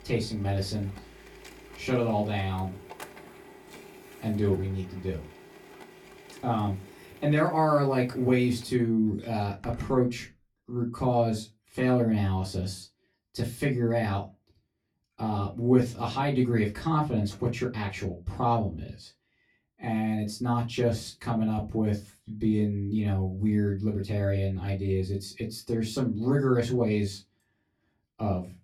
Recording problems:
off-mic speech; far
room echo; very slight; dies away in 0.2 s
household noises; faint; until 10 s; 20 dB below the speech

